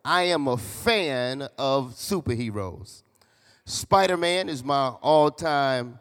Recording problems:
none

